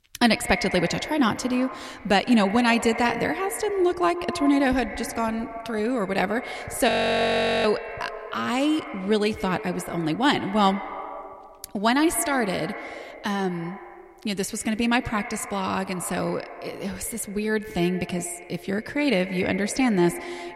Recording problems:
echo of what is said; strong; throughout; 120 ms later, 10 dB below the speech
audio freezing; at 7 s for 1 s

